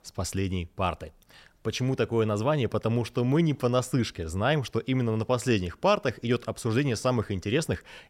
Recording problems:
none

